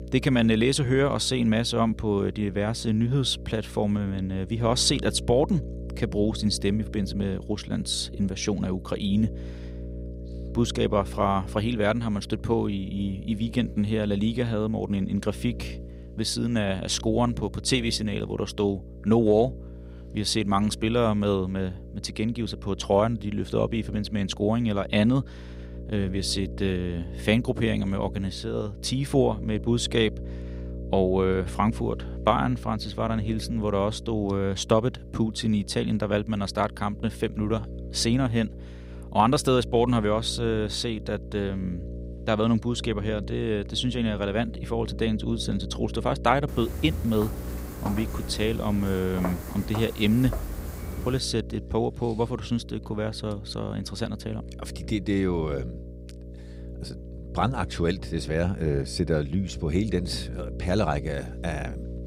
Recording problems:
electrical hum; noticeable; throughout; 60 Hz, 20 dB below the speech
footsteps; noticeable; from 46 to 51 s; peak 8 dB below the speech

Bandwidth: 15.5 kHz